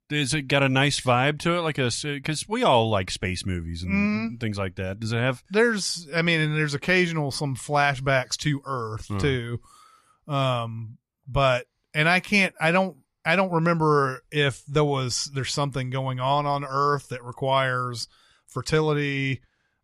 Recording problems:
none

